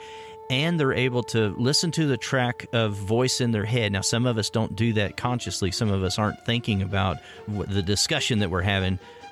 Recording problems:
background music; faint; throughout; 20 dB below the speech

